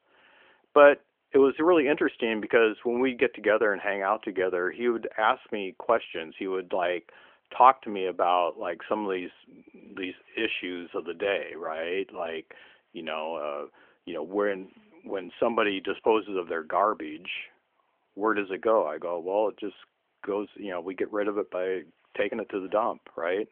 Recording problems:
phone-call audio; nothing above 3.5 kHz

